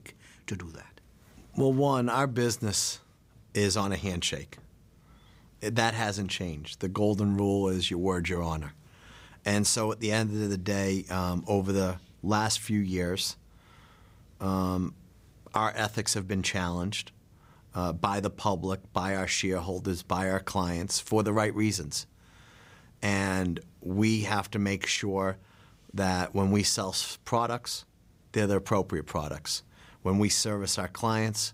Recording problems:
none

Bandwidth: 15.5 kHz